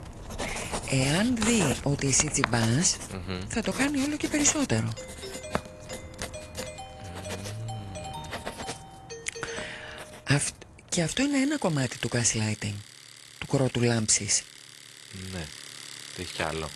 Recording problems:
garbled, watery; slightly; nothing above 10 kHz
household noises; noticeable; throughout; 10 dB below the speech
doorbell; faint; from 5 to 10 s; peak 10 dB below the speech

